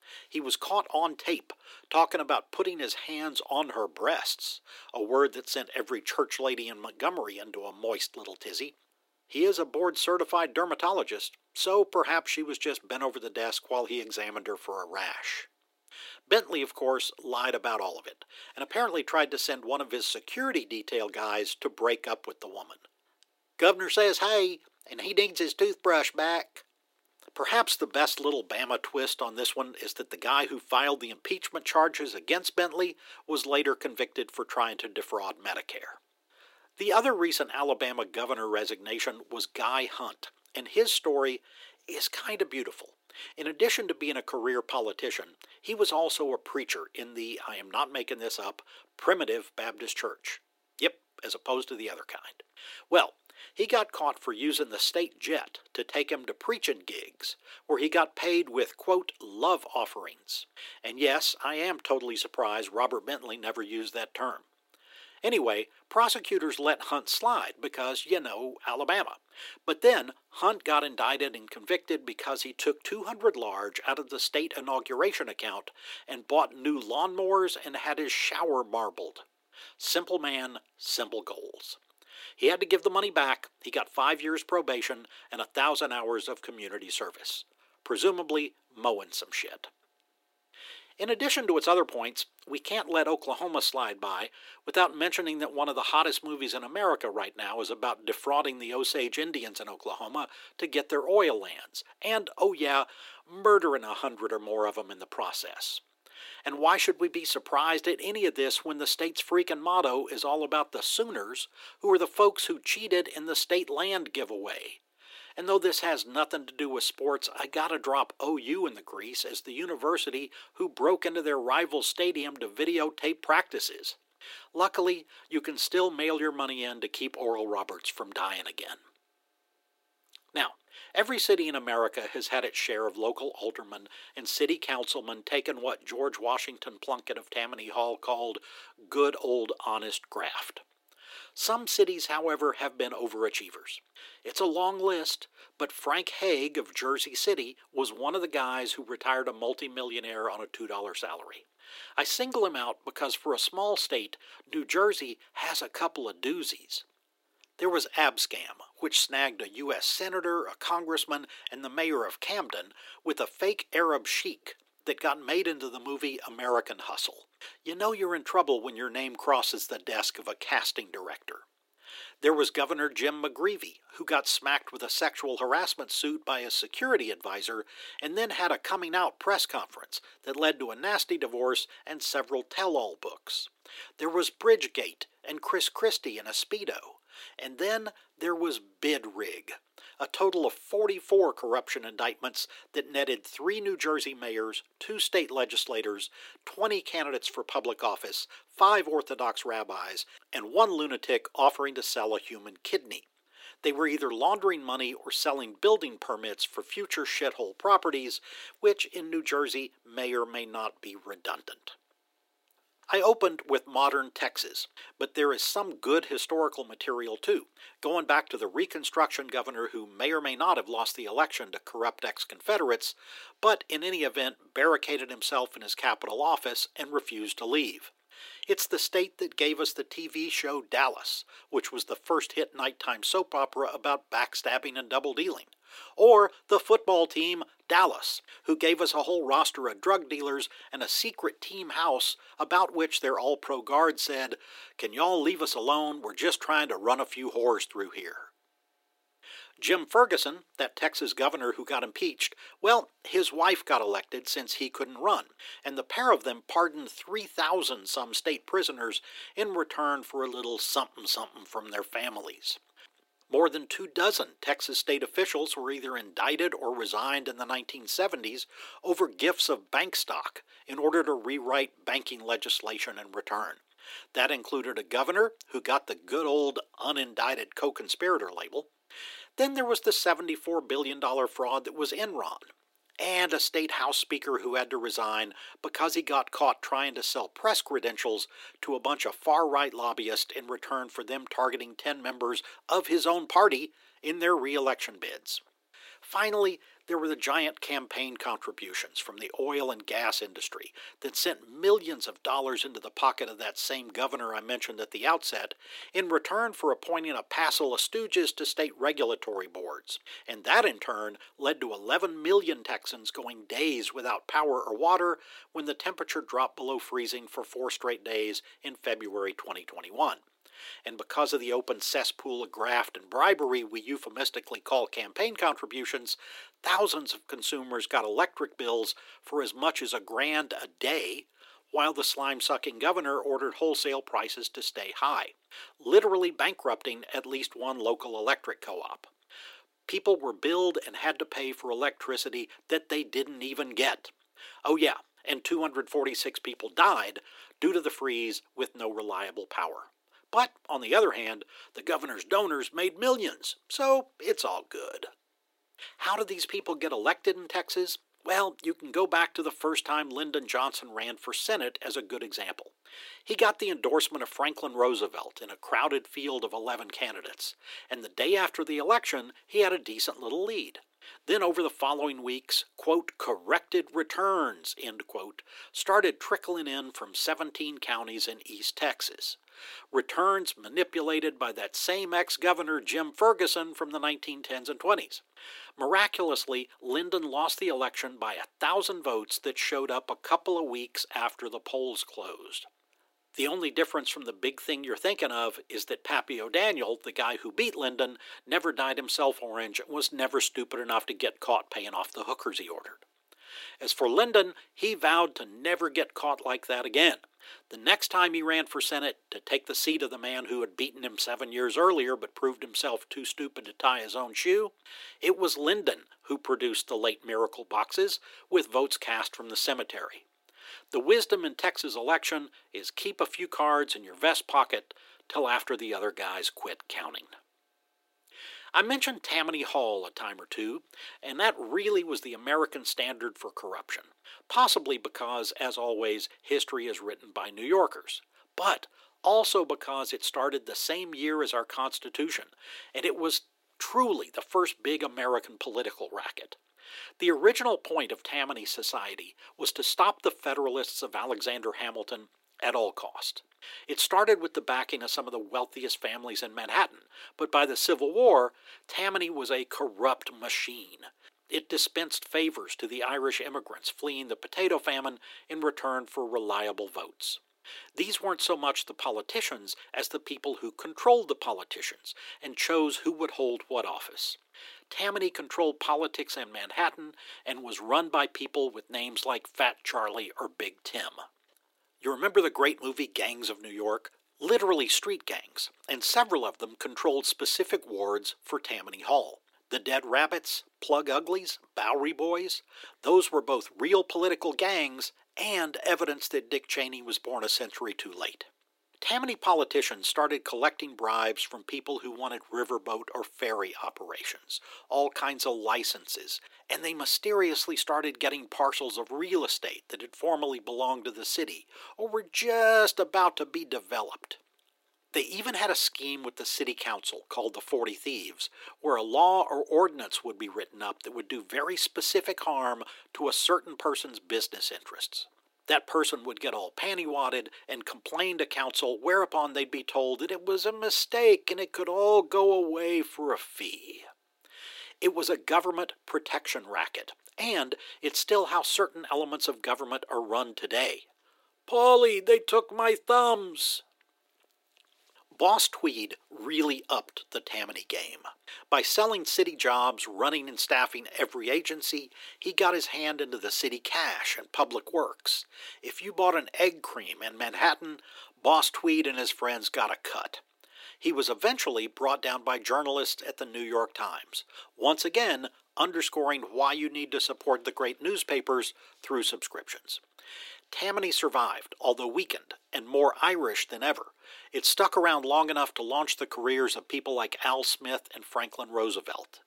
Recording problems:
thin; very; fading below 350 Hz

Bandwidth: 16 kHz